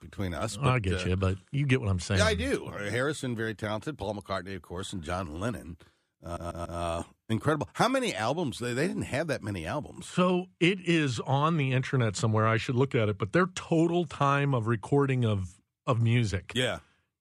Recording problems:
audio stuttering; at 6 s

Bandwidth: 14.5 kHz